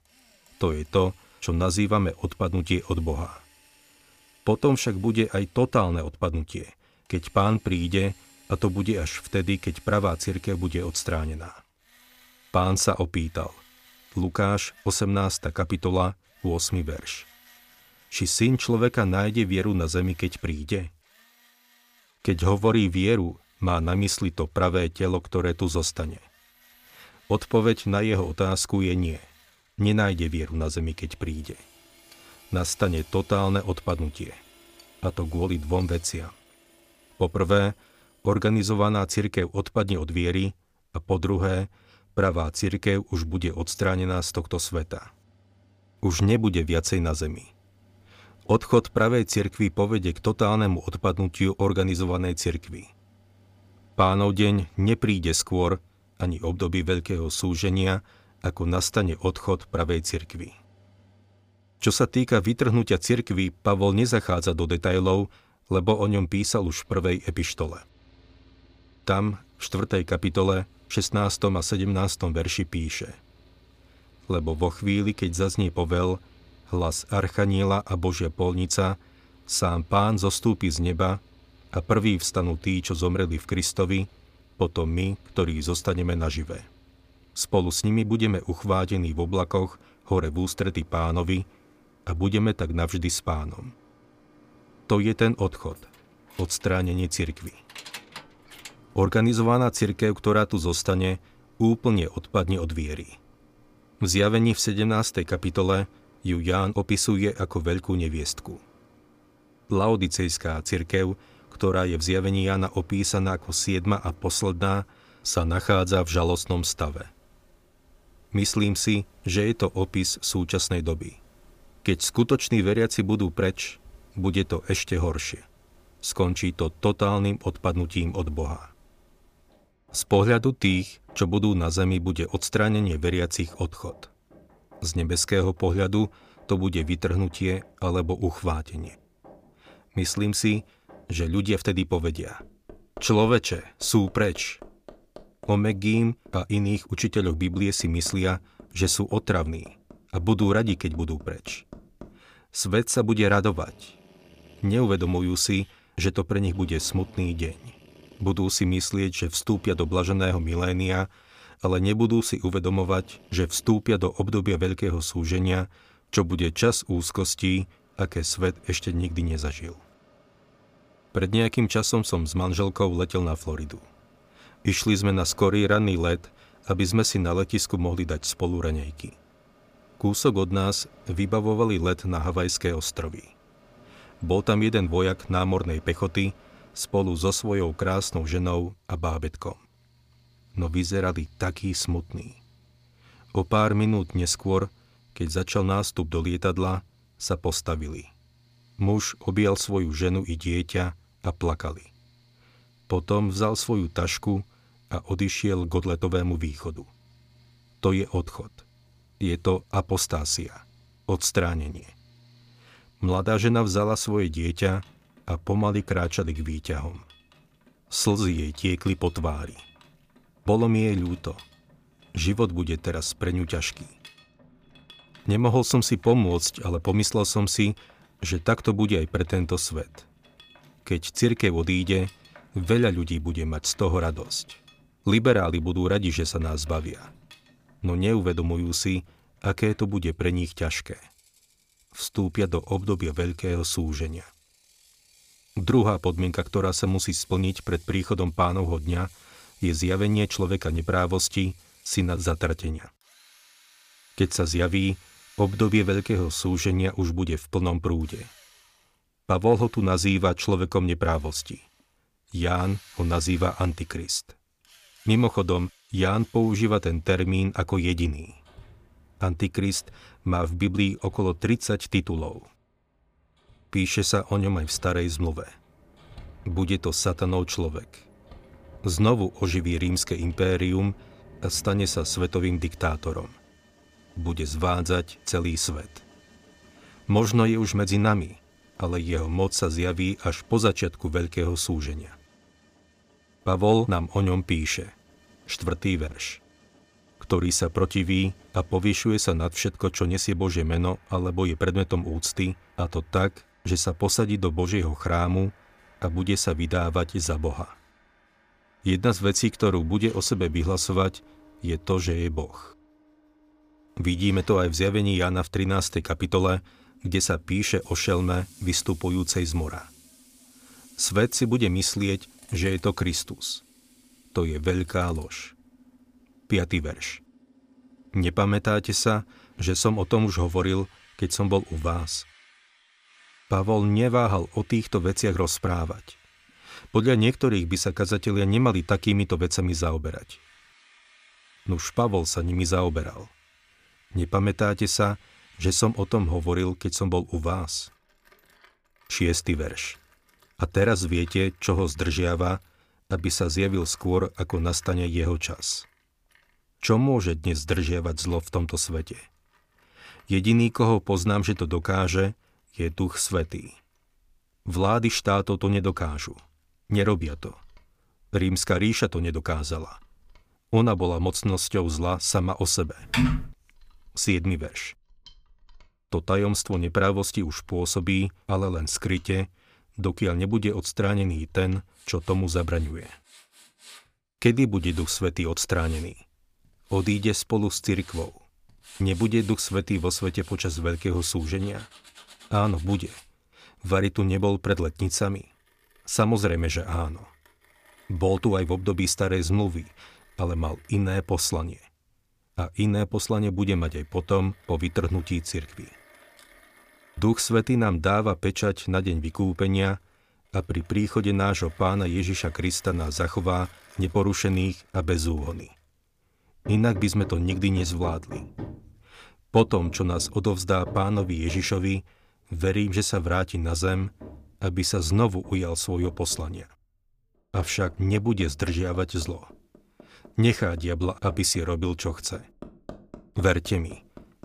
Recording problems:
machinery noise; faint; throughout; 30 dB below the speech
jangling keys; faint; from 1:36 to 1:39; peak 15 dB below the speech
keyboard typing; loud; at 6:13; peak 2 dB above the speech

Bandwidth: 15 kHz